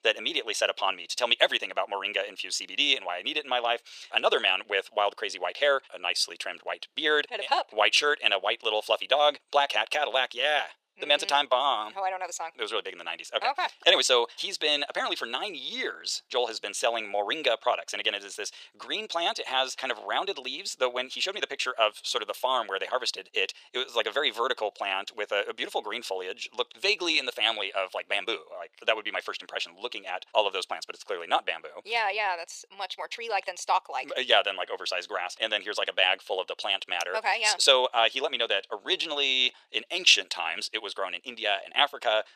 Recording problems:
thin; very; fading below 450 Hz
wrong speed, natural pitch; too fast; 1.5 times normal speed

